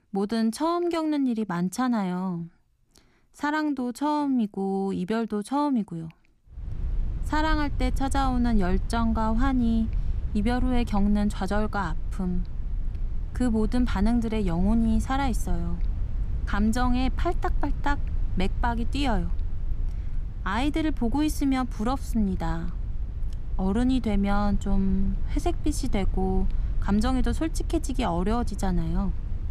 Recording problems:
low rumble; faint; from 6.5 s on; 20 dB below the speech

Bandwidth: 14.5 kHz